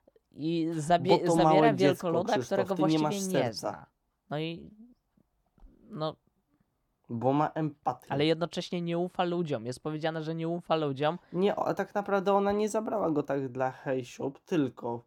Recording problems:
muffled; slightly; fading above 1.5 kHz

